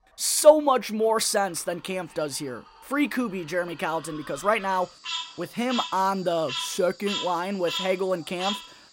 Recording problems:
animal sounds; loud; throughout; 8 dB below the speech

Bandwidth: 16 kHz